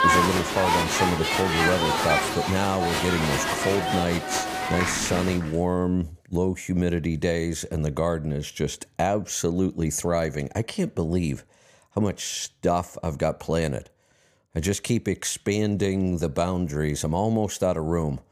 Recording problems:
crowd noise; very loud; until 5 s; 1 dB above the speech

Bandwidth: 15 kHz